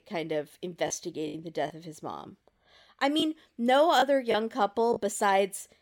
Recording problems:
choppy; occasionally; 5% of the speech affected

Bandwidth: 17 kHz